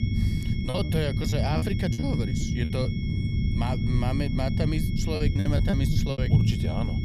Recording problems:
low rumble; loud; throughout; 4 dB below the speech
high-pitched whine; noticeable; throughout; 2 kHz, 10 dB below the speech
choppy; very; from 0.5 to 3 s and from 5 to 6 s; 15% of the speech affected

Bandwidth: 14 kHz